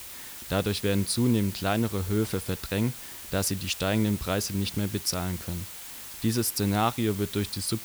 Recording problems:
hiss; noticeable; throughout; 10 dB below the speech

